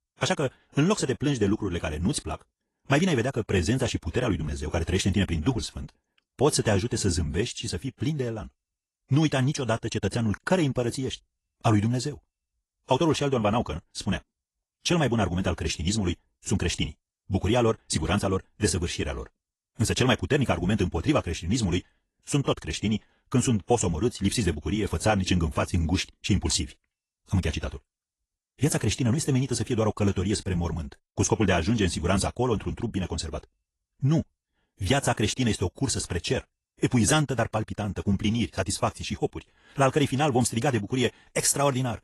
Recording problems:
wrong speed, natural pitch; too fast; 1.5 times normal speed
garbled, watery; slightly; nothing above 11.5 kHz

